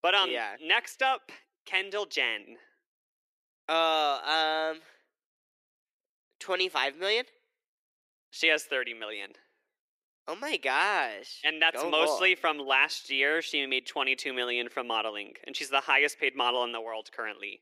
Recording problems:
thin; somewhat; fading below 350 Hz

